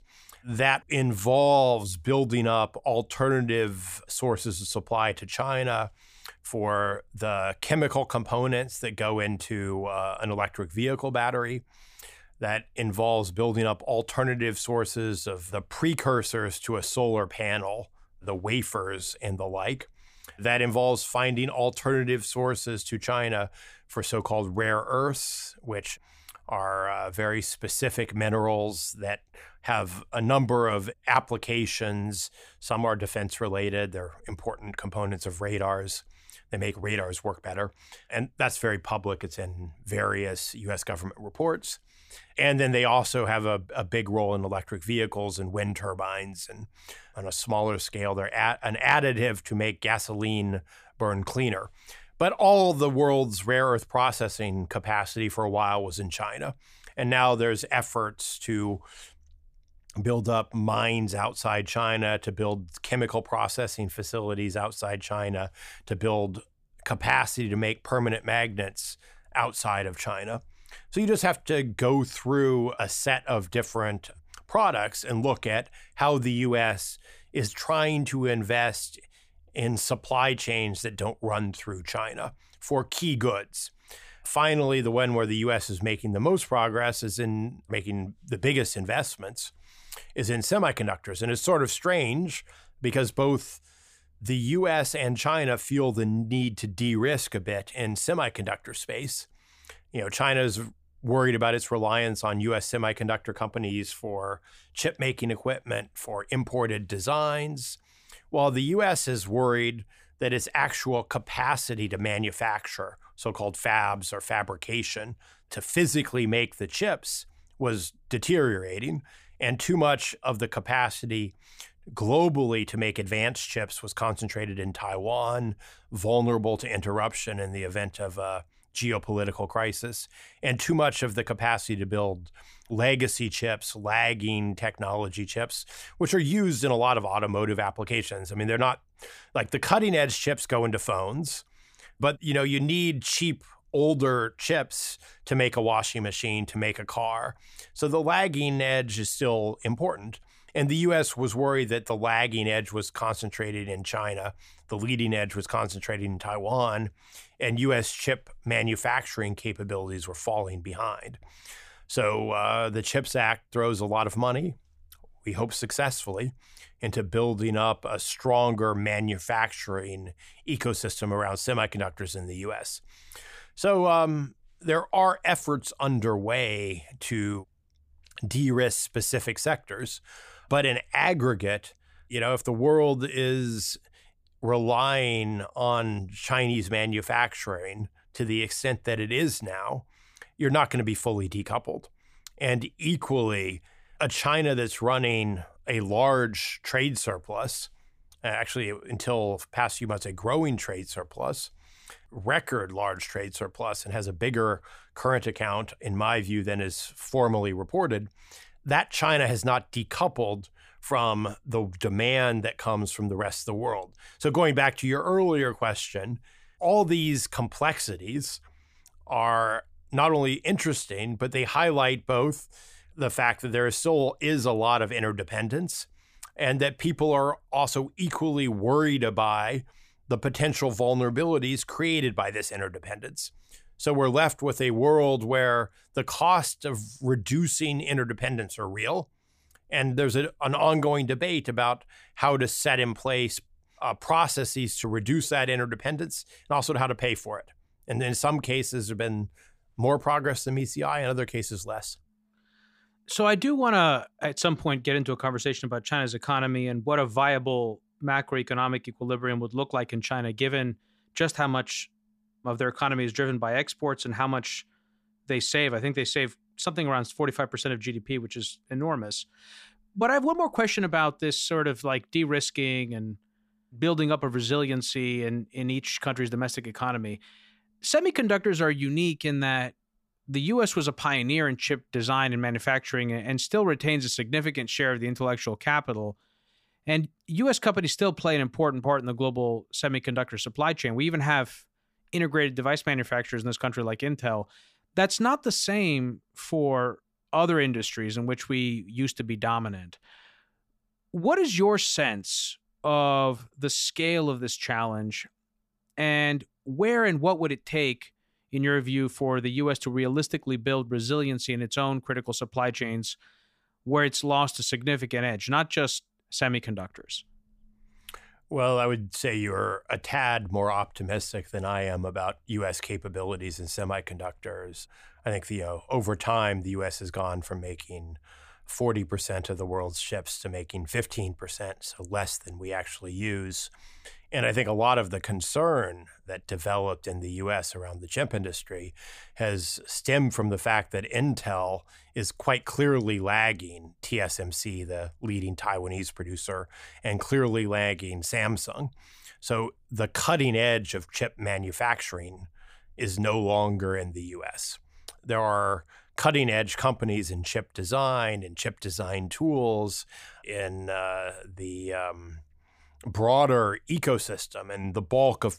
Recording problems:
none

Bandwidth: 15 kHz